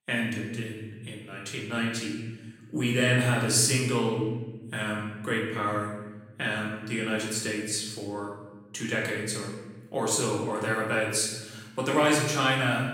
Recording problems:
off-mic speech; far
room echo; noticeable; dies away in 1.3 s

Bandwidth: 16 kHz